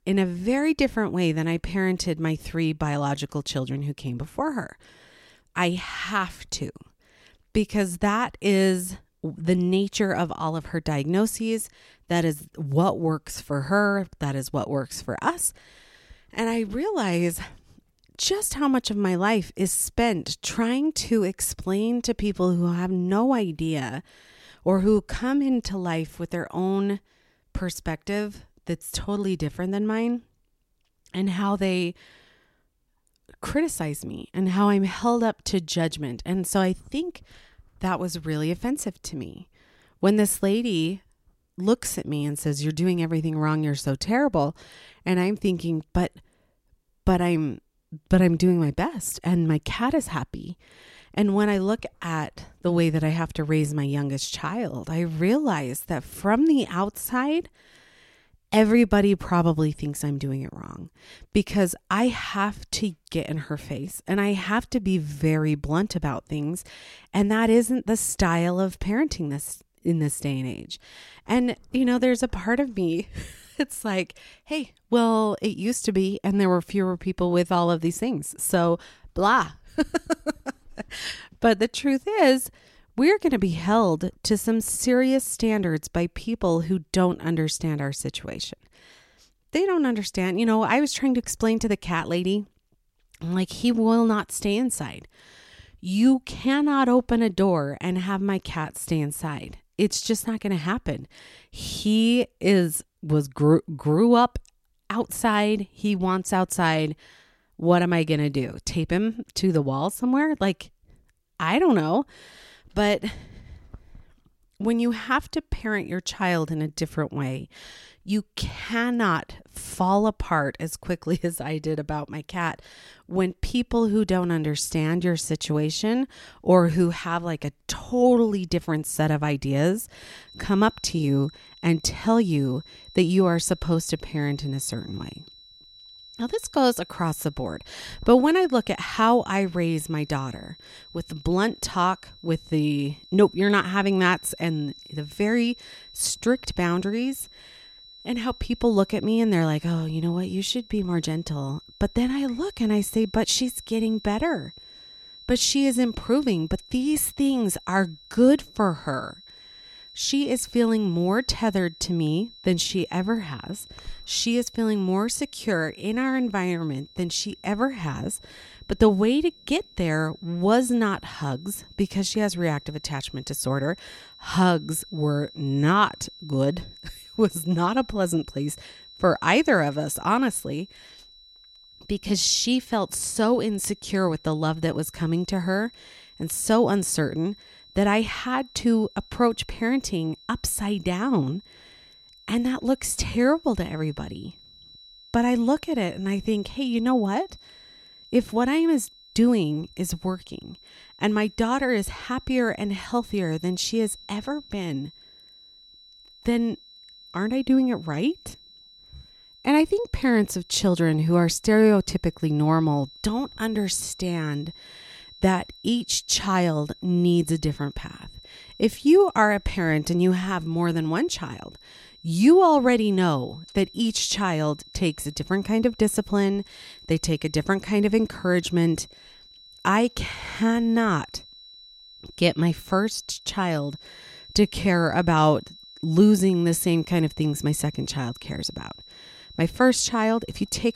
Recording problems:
high-pitched whine; faint; from 2:10 on; 4 kHz, 20 dB below the speech

